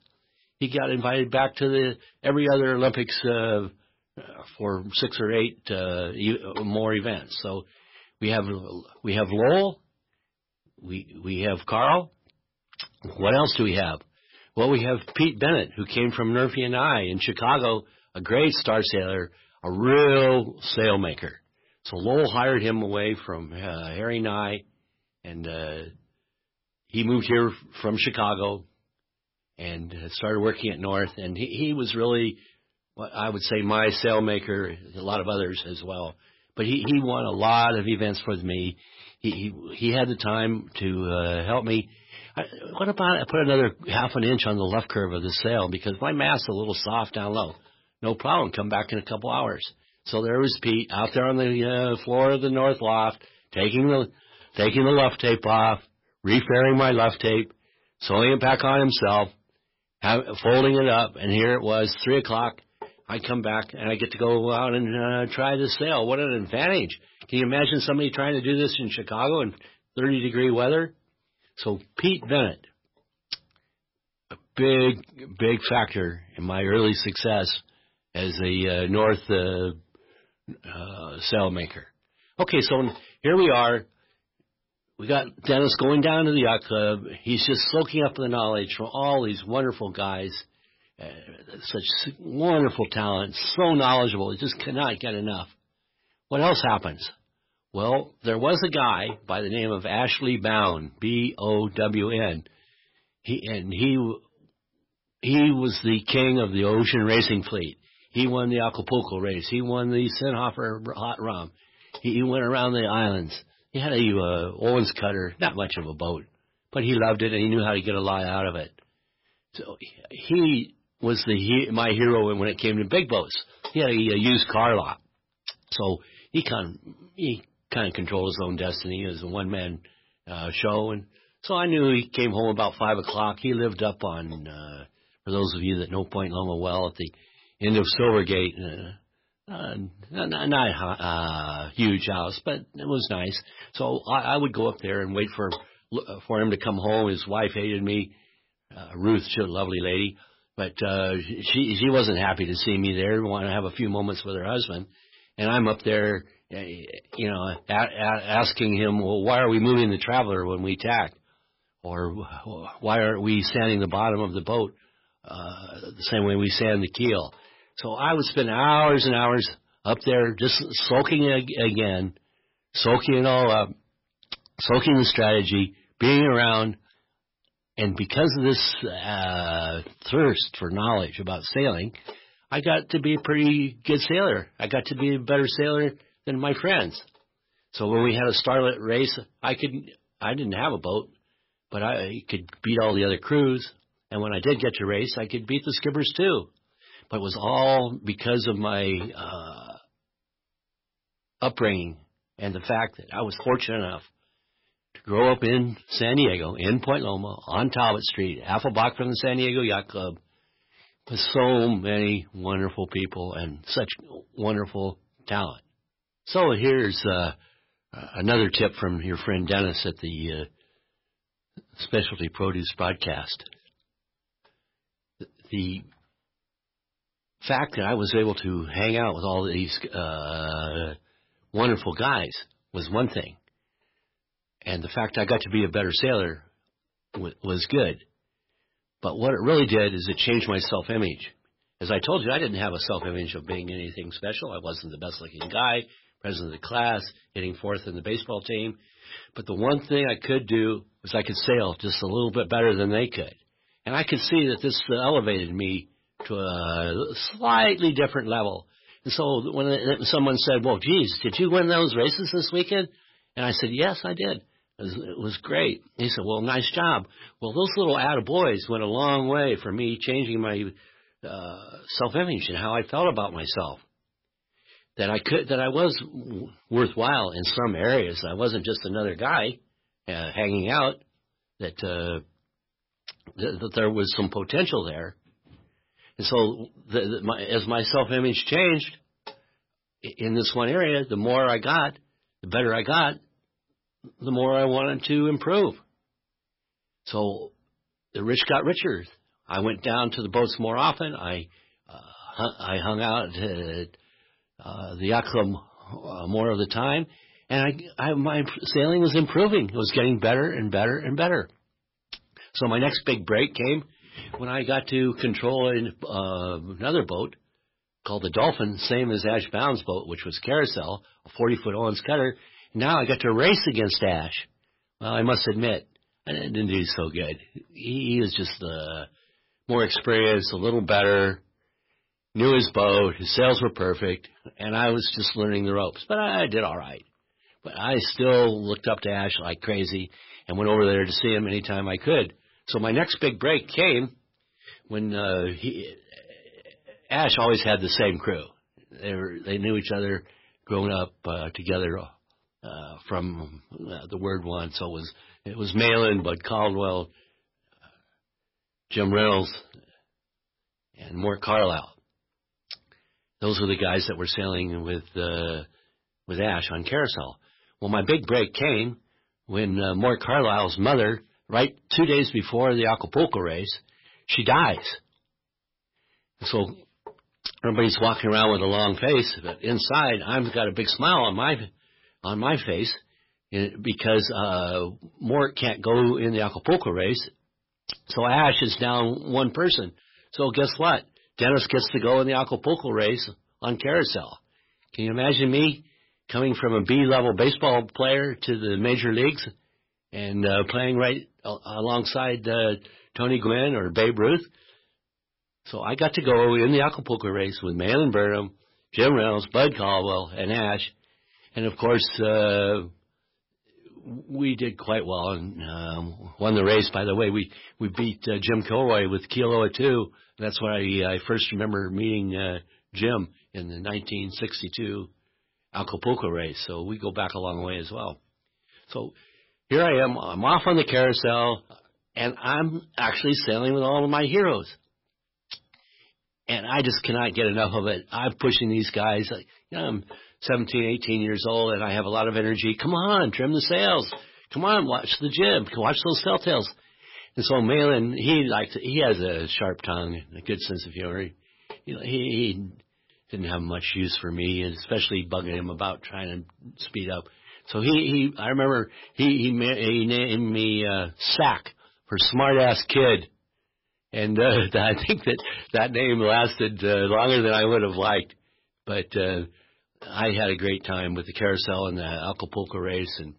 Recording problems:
garbled, watery; badly; nothing above 5.5 kHz
distortion; slight; 3% of the sound clipped

